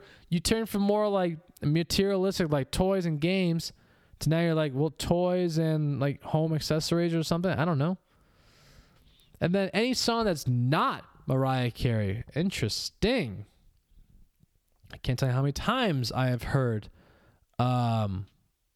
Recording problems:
squashed, flat; heavily

